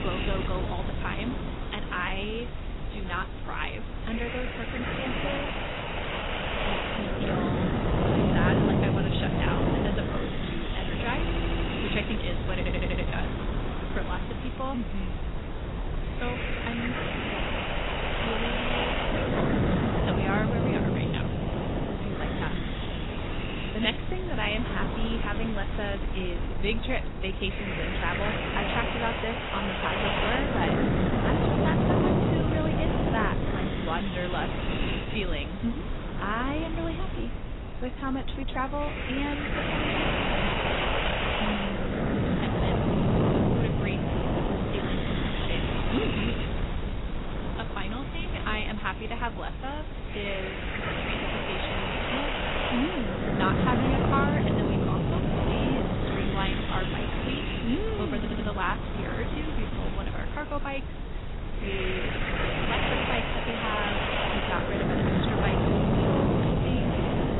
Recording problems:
garbled, watery; badly; nothing above 4 kHz
wind noise on the microphone; heavy; 3 dB above the speech
hiss; noticeable; until 26 s and from 46 s on; 20 dB below the speech
audio stuttering; at 11 s, at 13 s and at 58 s

